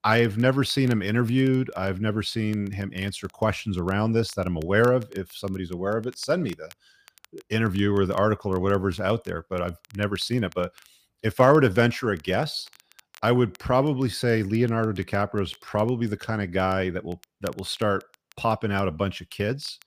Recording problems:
crackle, like an old record; faint; 30 dB below the speech

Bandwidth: 15 kHz